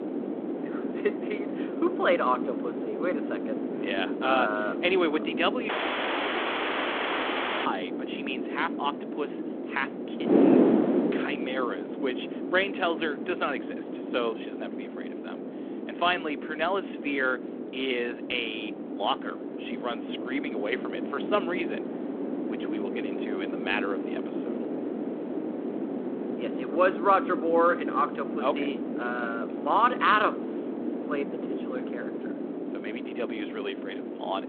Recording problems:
phone-call audio
wind noise on the microphone; heavy; 7 dB below the speech
audio cutting out; at 5.5 s for 2 s

